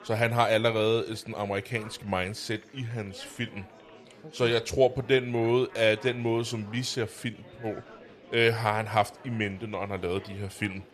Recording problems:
chatter from many people; faint; throughout; 20 dB below the speech

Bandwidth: 14 kHz